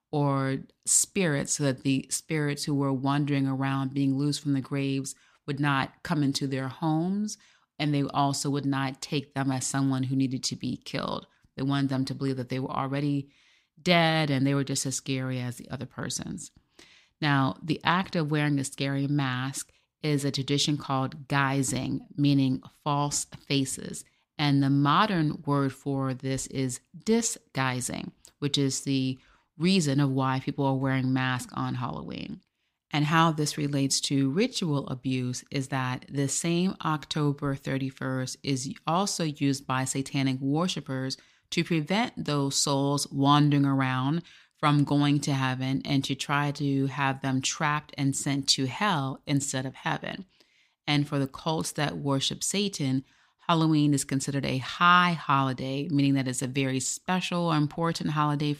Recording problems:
none

